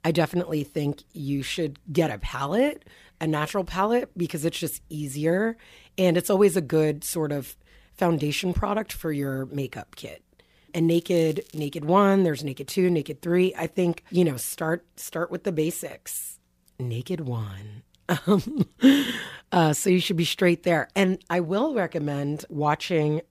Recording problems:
crackling; faint; at 11 s; 25 dB below the speech

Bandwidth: 15 kHz